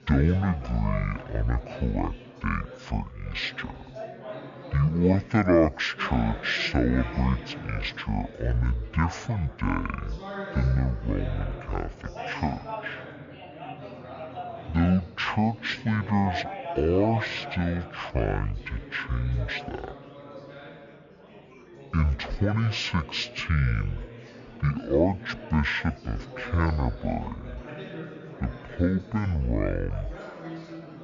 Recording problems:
wrong speed and pitch; too slow and too low; 0.5 times normal speed
chatter from many people; noticeable; throughout; 15 dB below the speech

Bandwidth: 7 kHz